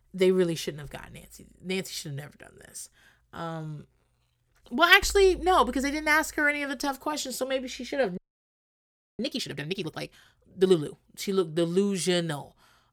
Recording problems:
audio freezing; at 8 s for 1 s

